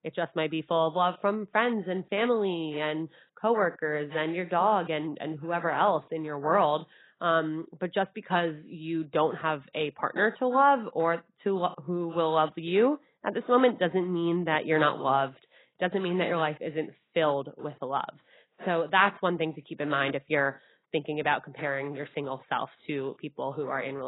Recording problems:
garbled, watery; badly; nothing above 4 kHz
muffled; very slightly; fading above 3 kHz
abrupt cut into speech; at the end

